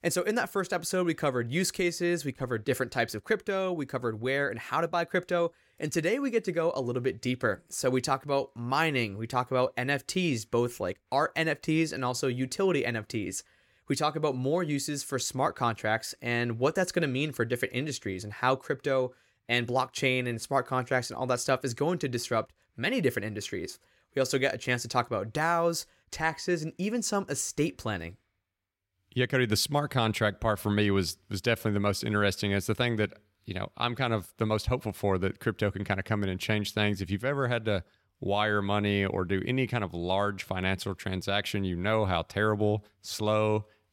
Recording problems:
none

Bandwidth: 16.5 kHz